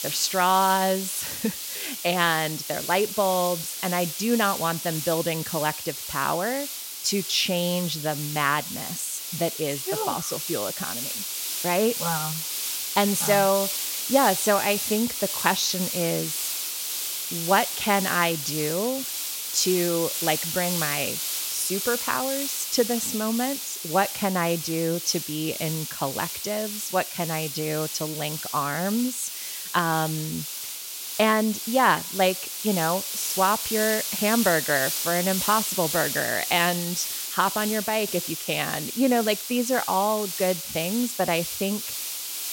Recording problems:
hiss; loud; throughout; 3 dB below the speech

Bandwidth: 16.5 kHz